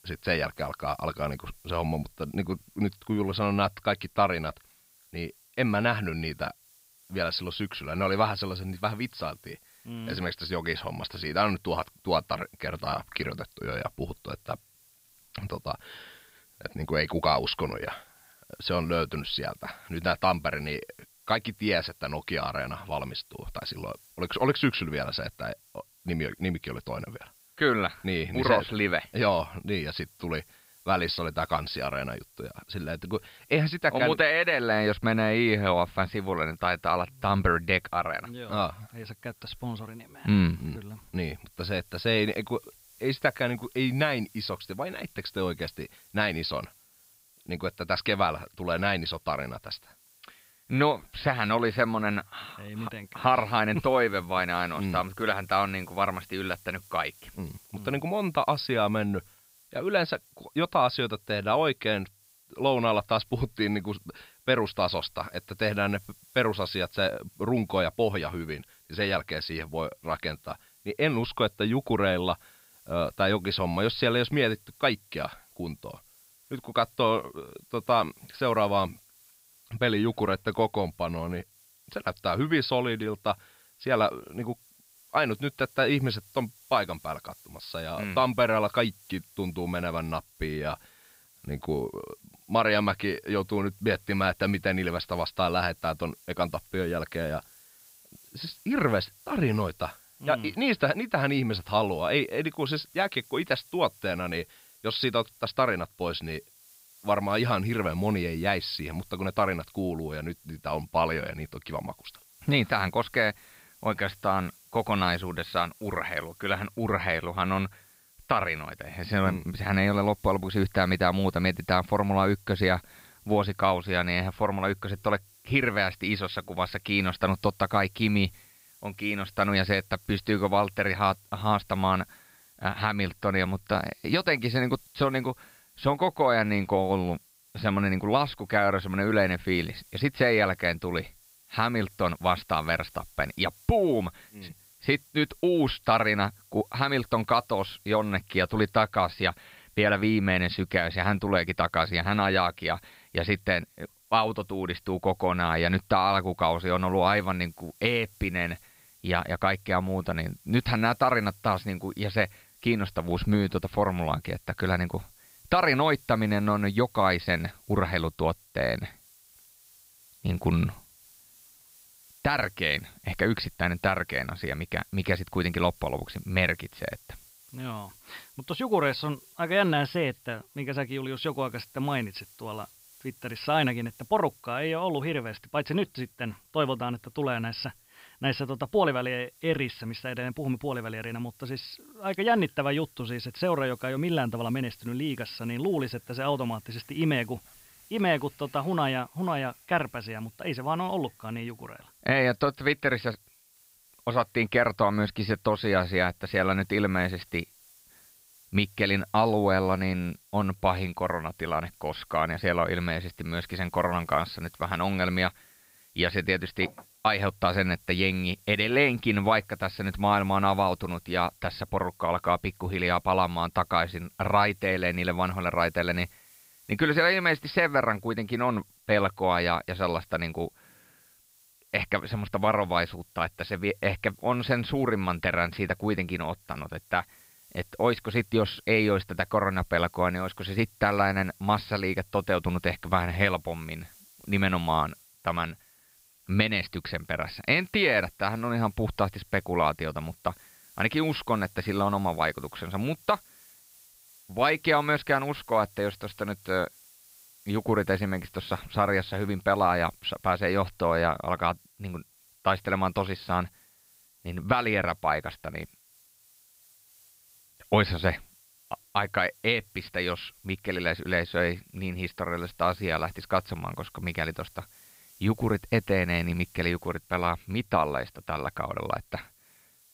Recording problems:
high frequencies cut off; noticeable; nothing above 5.5 kHz
hiss; faint; throughout; 25 dB below the speech

